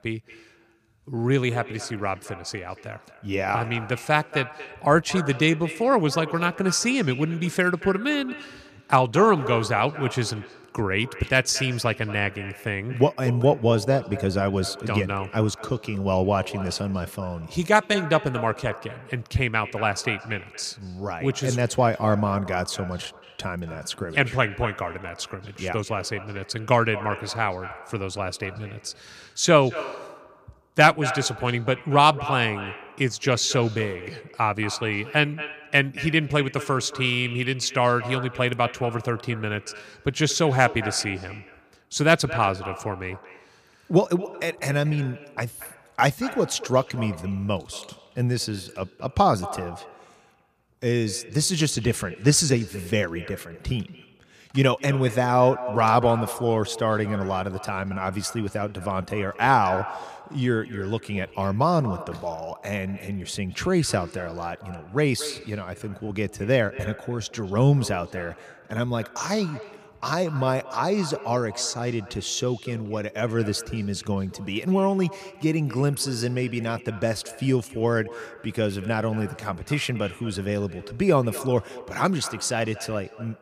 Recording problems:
echo of what is said; noticeable; throughout; 230 ms later, 15 dB below the speech

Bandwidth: 15 kHz